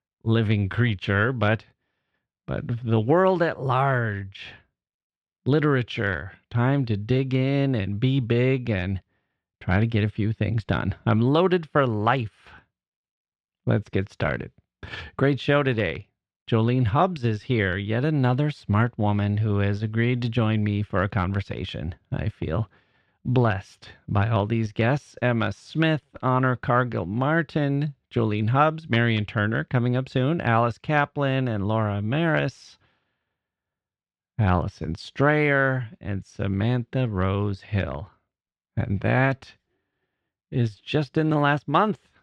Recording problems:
muffled; slightly; fading above 3 kHz

